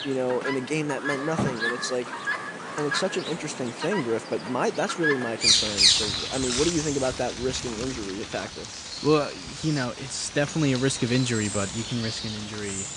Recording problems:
garbled, watery; slightly; nothing above 8.5 kHz
animal sounds; very loud; throughout; 1 dB above the speech
alarm; noticeable; from 1 to 3 s; peak 10 dB below the speech

